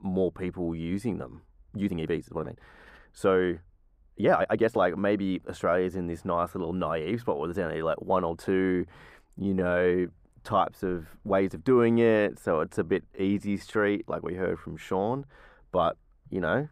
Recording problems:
muffled; slightly; fading above 2 kHz
uneven, jittery; strongly; from 1.5 to 14 s

